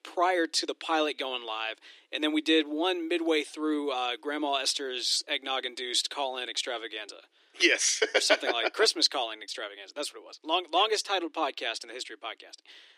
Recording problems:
thin; very; fading below 300 Hz

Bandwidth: 14.5 kHz